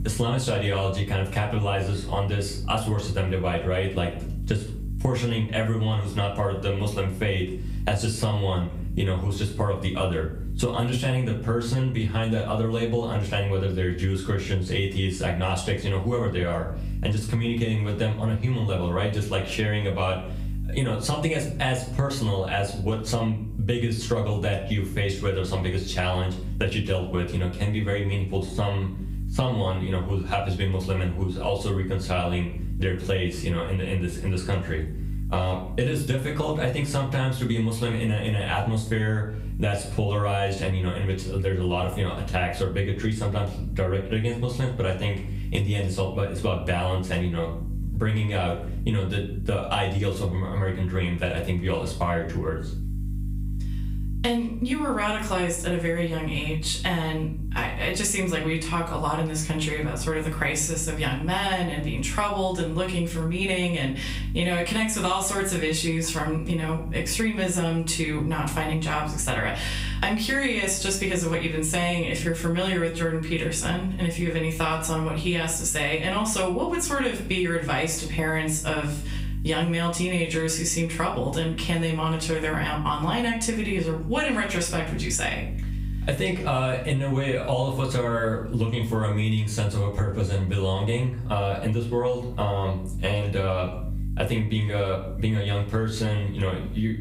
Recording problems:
off-mic speech; far
room echo; slight; dies away in 0.3 s
squashed, flat; somewhat
electrical hum; faint; throughout; 50 Hz, 25 dB below the speech

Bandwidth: 15.5 kHz